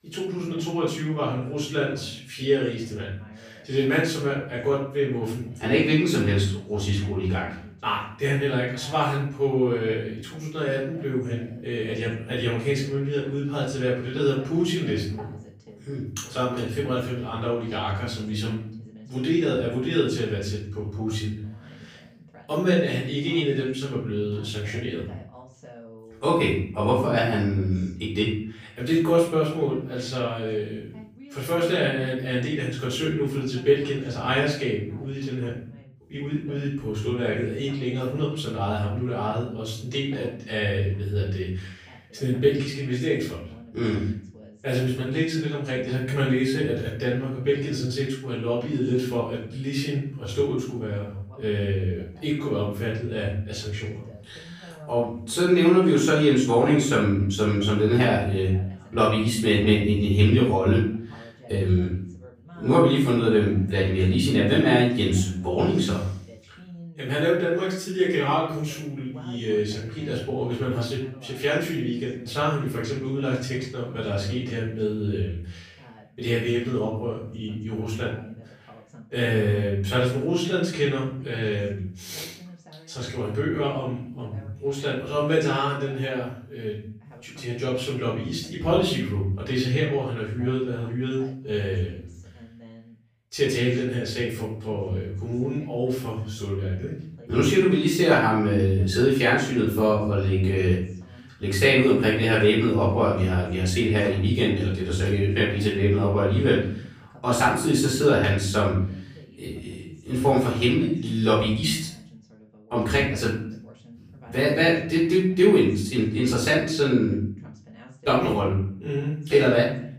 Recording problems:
off-mic speech; far
room echo; noticeable; dies away in 0.5 s
voice in the background; faint; throughout; 25 dB below the speech

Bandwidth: 15 kHz